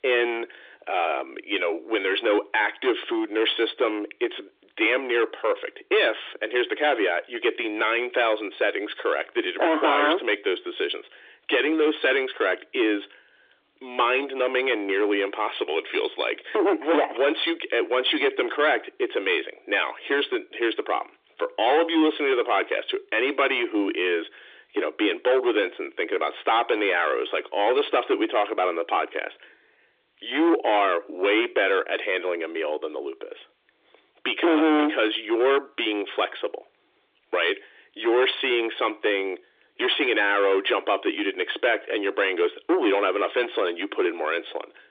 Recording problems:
distortion; heavy; 7 dB below the speech
phone-call audio; nothing above 3.5 kHz

